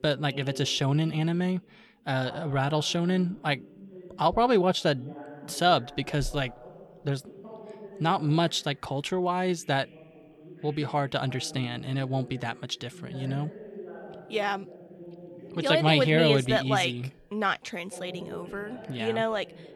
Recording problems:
voice in the background; noticeable; throughout; 20 dB below the speech

